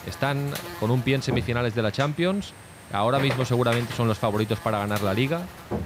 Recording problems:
electrical hum; loud; throughout; 50 Hz, 10 dB below the speech
high-pitched whine; faint; from 2 to 5 s; 8.5 kHz, 30 dB below the speech

